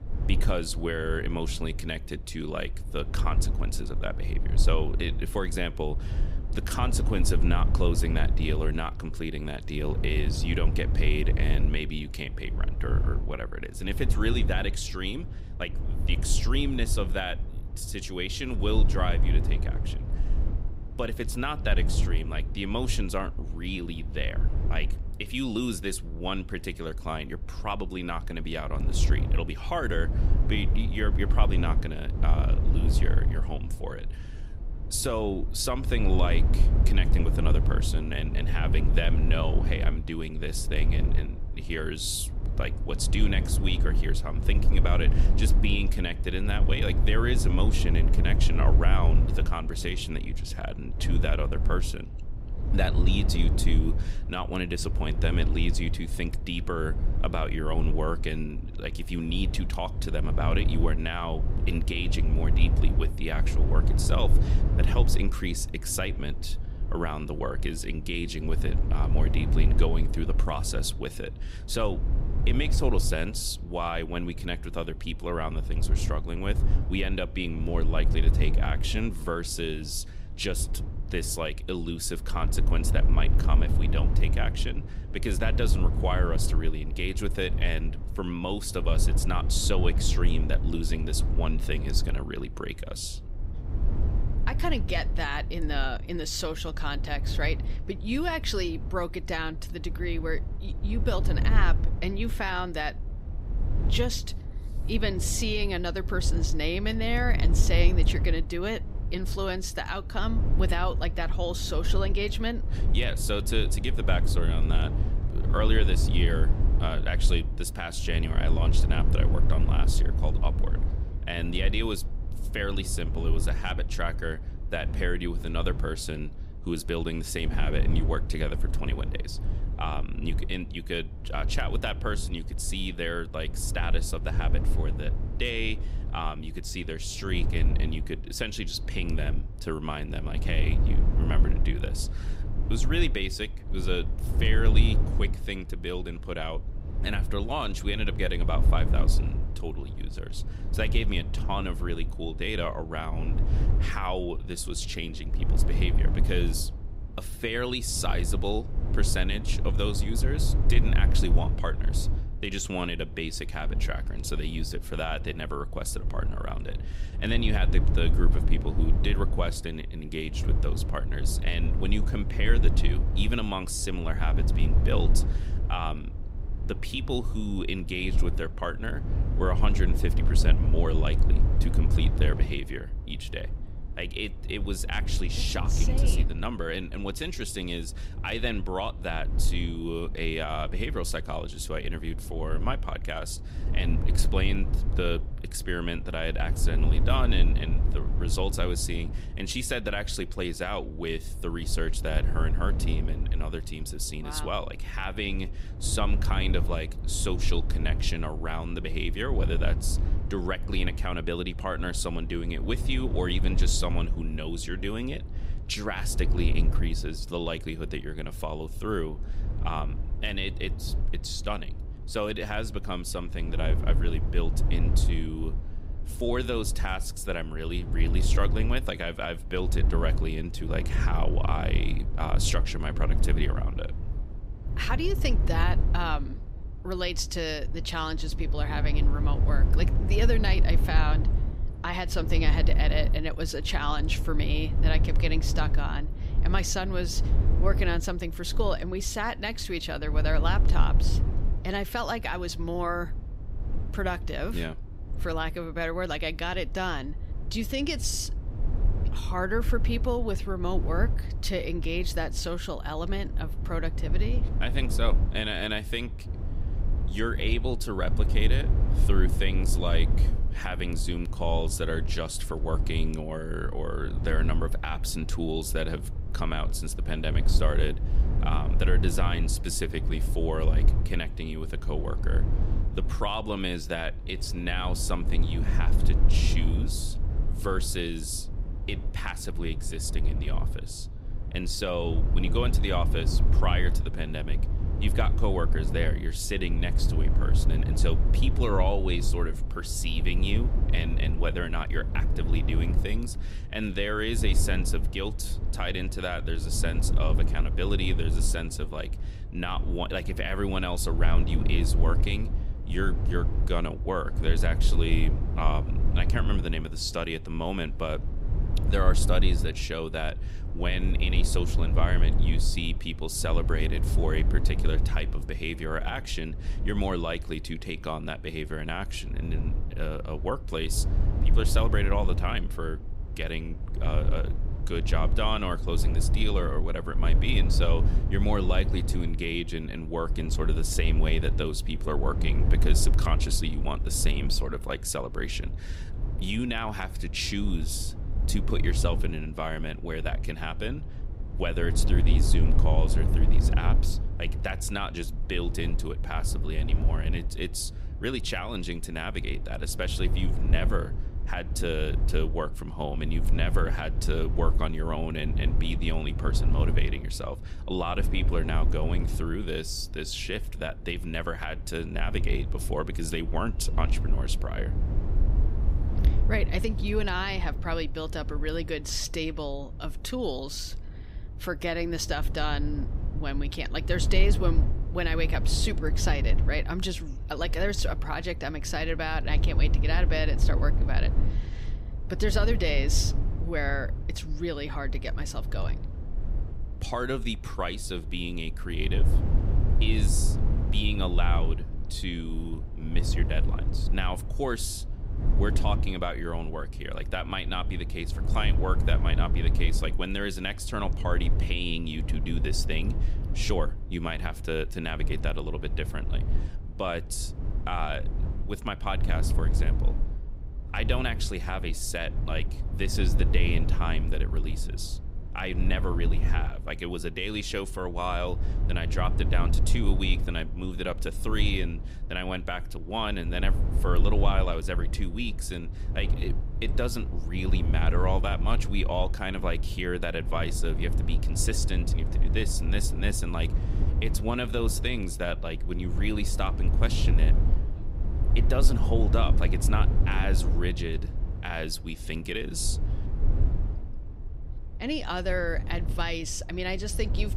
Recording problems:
low rumble; noticeable; throughout; 10 dB below the speech

